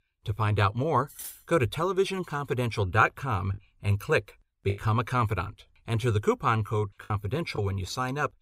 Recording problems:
clattering dishes; faint; at 1 s; peak 10 dB below the speech
choppy; occasionally; from 3.5 to 5 s and from 5.5 to 7.5 s; 4% of the speech affected

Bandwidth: 15.5 kHz